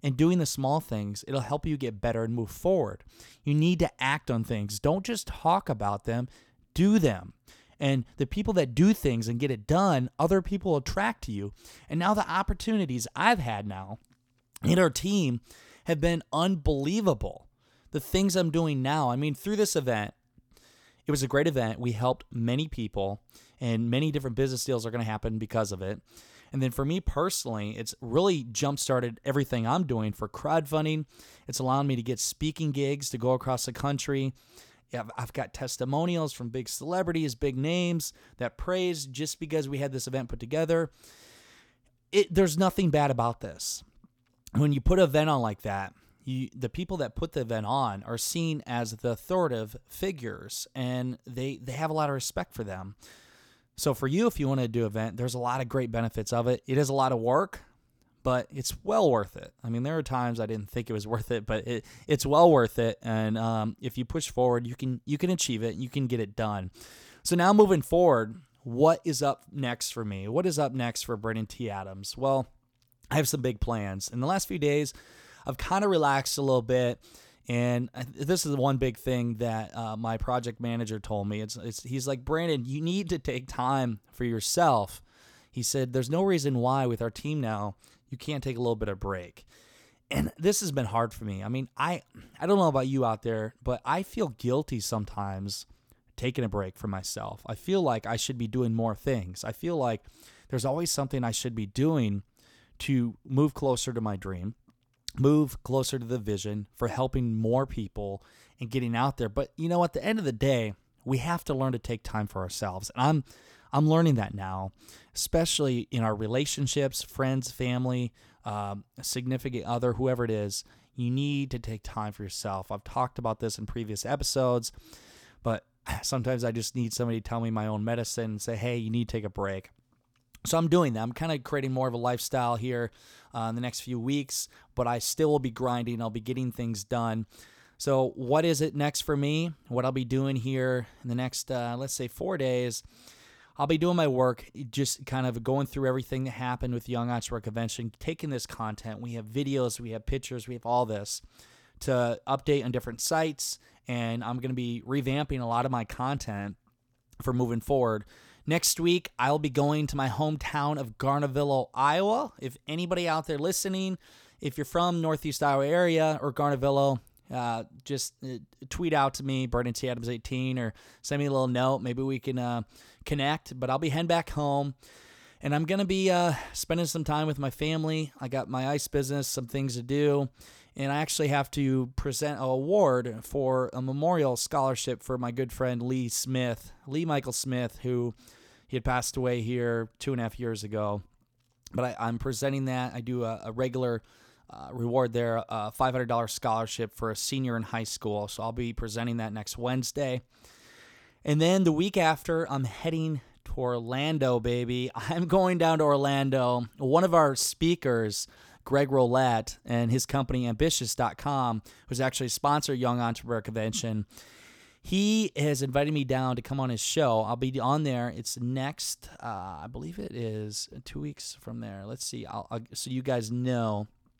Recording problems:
none

